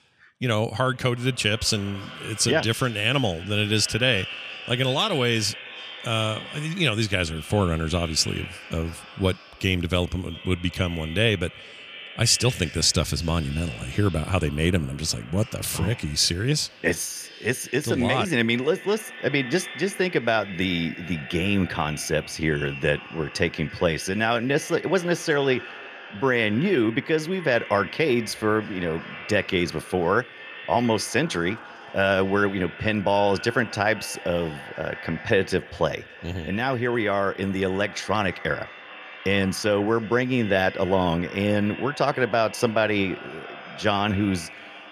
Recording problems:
echo of what is said; noticeable; throughout; 340 ms later, 15 dB below the speech

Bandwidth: 14.5 kHz